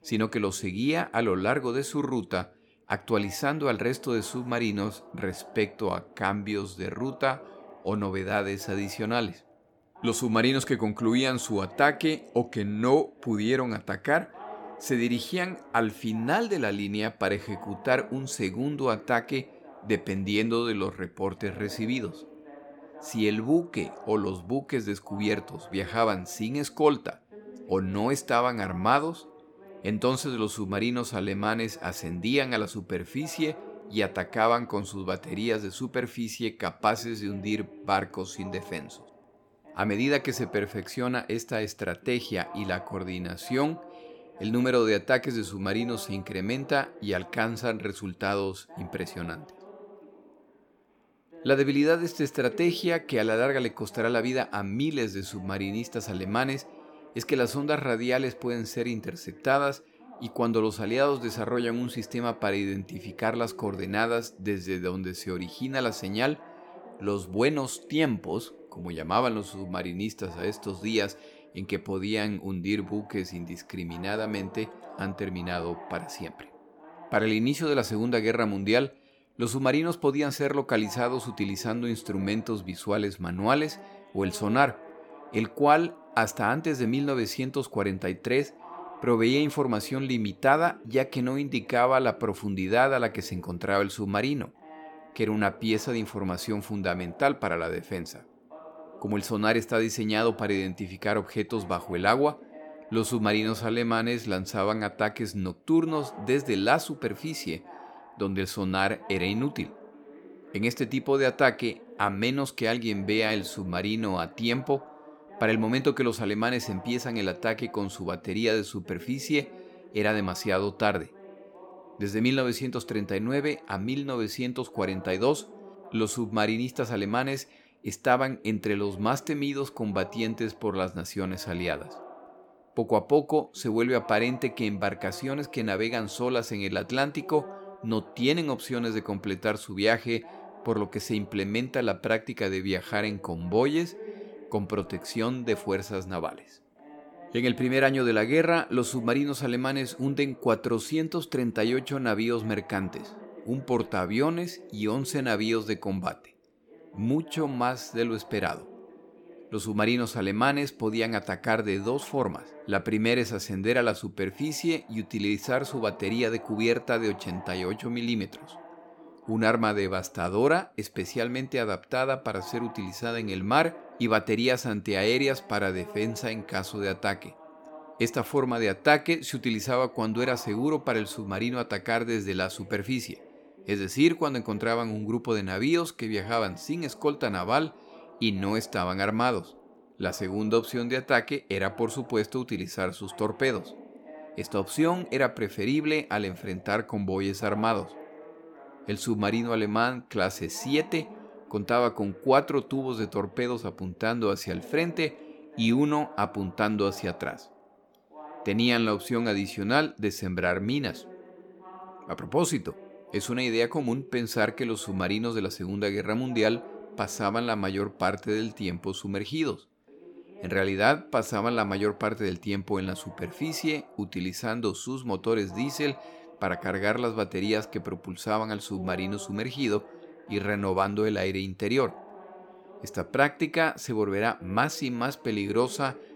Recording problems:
voice in the background; noticeable; throughout; 20 dB below the speech

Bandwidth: 17.5 kHz